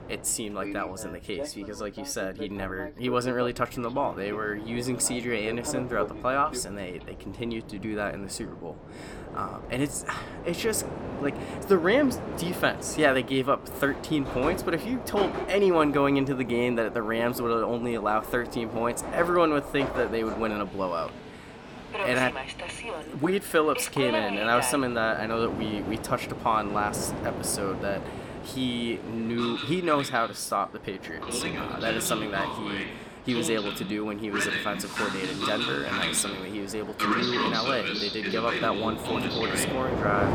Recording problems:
train or aircraft noise; loud; throughout; 5 dB below the speech

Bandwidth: 18 kHz